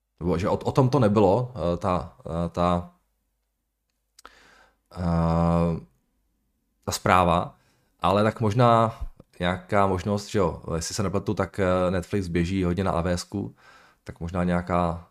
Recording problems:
none

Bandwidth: 15 kHz